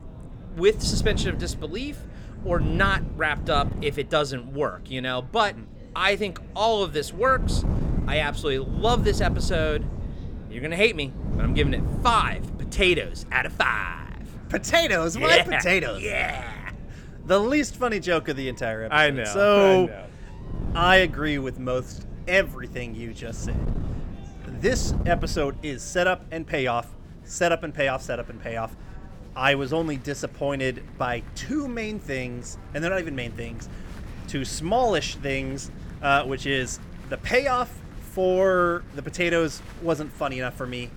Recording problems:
wind noise on the microphone; occasional gusts; 20 dB below the speech
chatter from many people; faint; throughout; 25 dB below the speech

